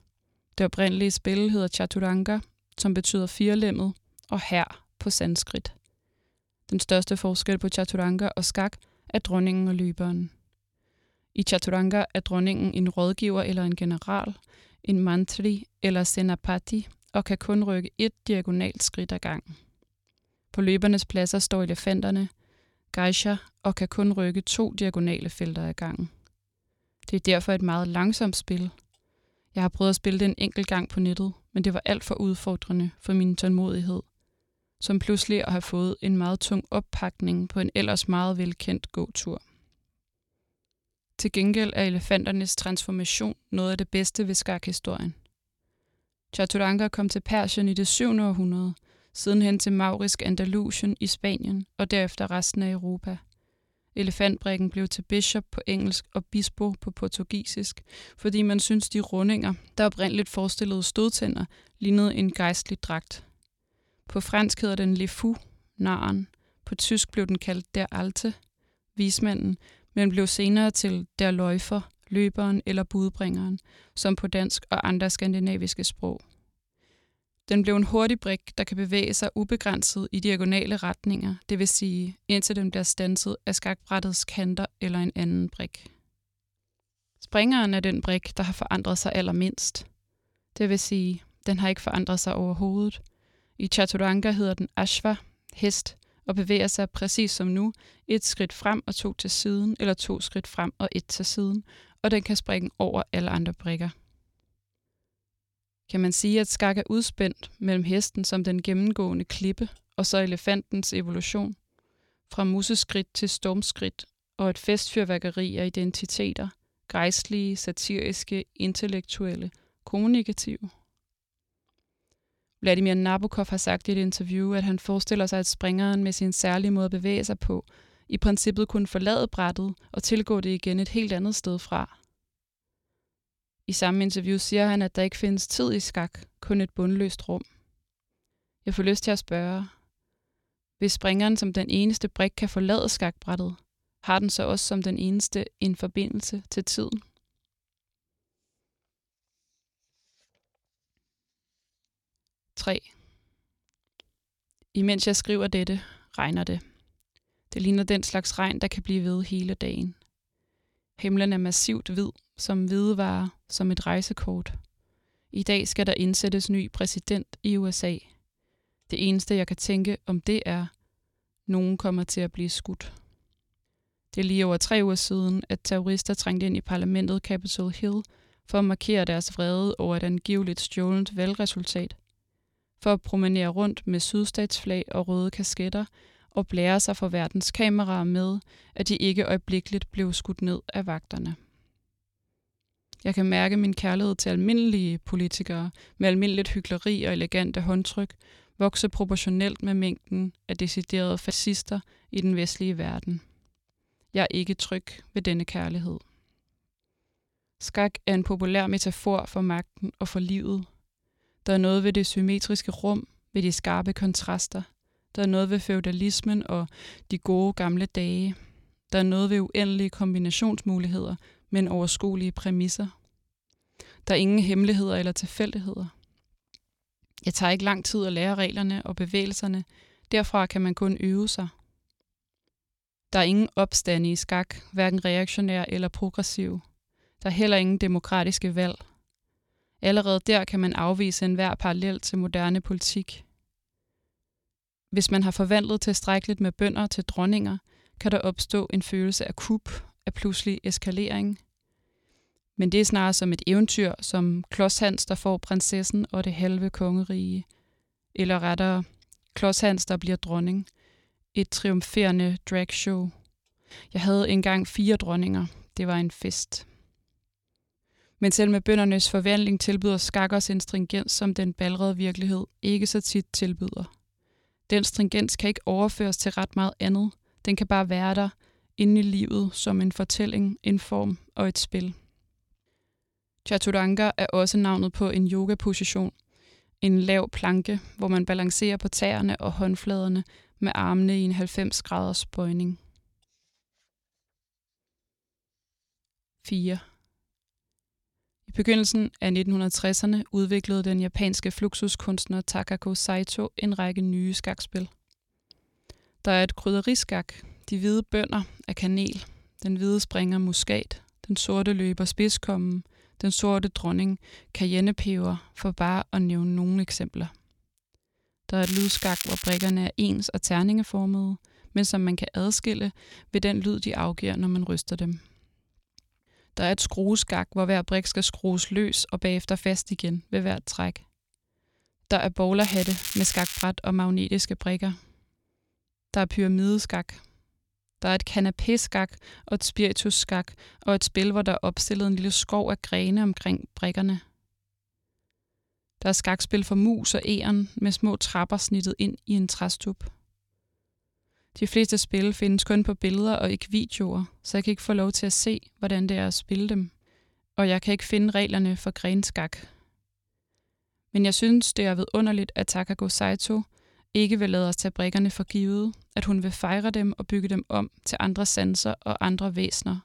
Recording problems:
crackling; loud; from 5:19 to 5:20 and from 5:33 to 5:34; 5 dB below the speech

